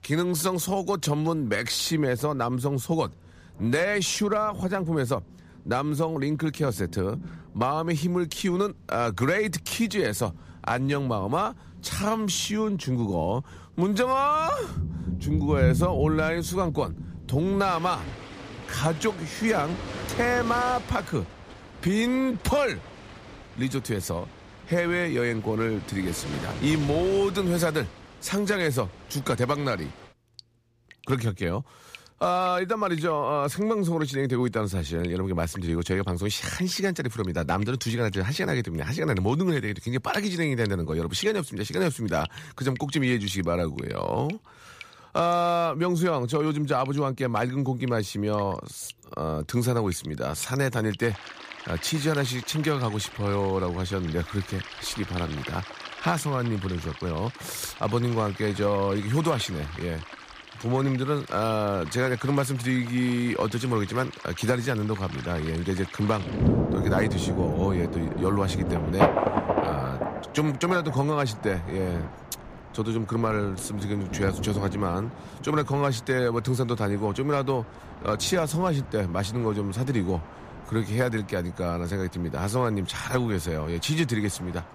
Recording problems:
rain or running water; loud; throughout; 9 dB below the speech

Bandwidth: 15 kHz